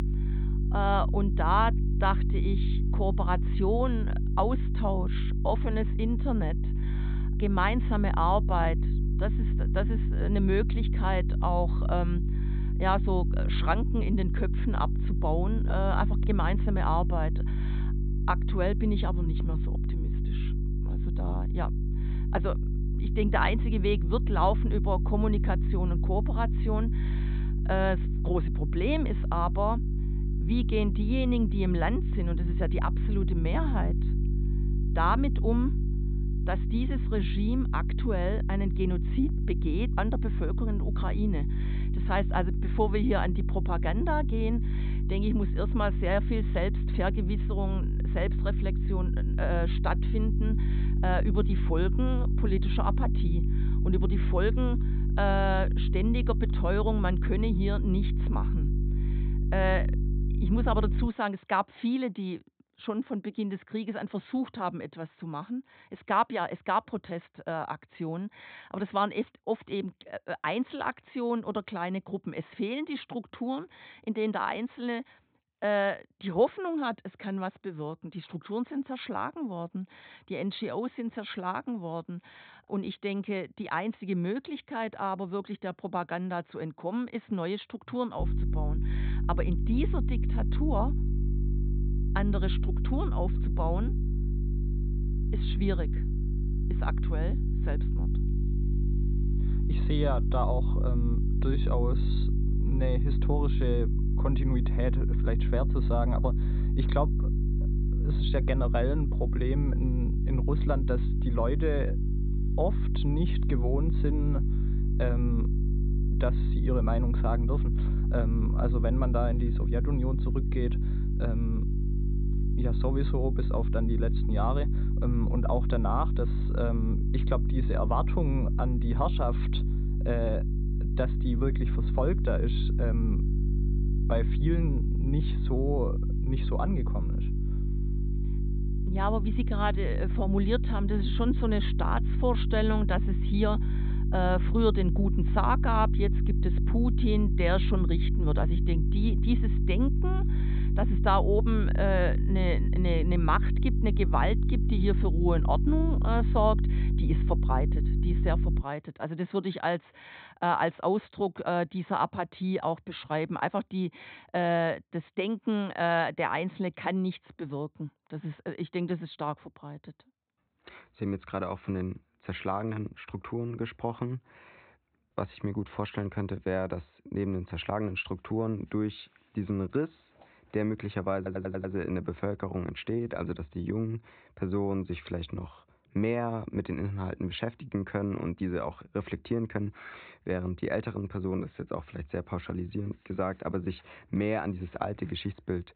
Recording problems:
high frequencies cut off; severe; nothing above 4 kHz
electrical hum; loud; until 1:01 and from 1:28 to 2:39; 50 Hz, 10 dB below the speech
audio stuttering; at 3:01

